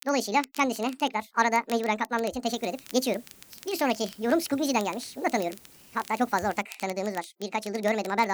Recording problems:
wrong speed and pitch; too fast and too high; 1.7 times normal speed
crackle, like an old record; noticeable; 20 dB below the speech
hiss; faint; from 2.5 to 6.5 s; 25 dB below the speech
abrupt cut into speech; at the end

